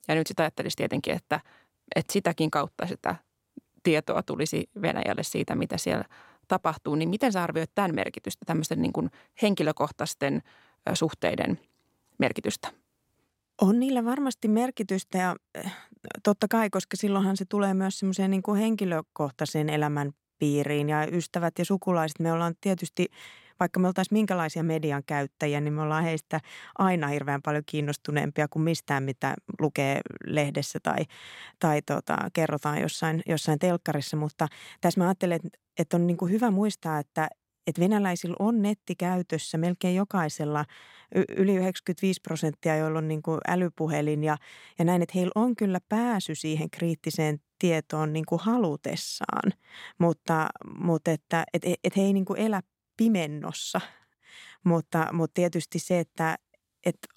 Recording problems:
none

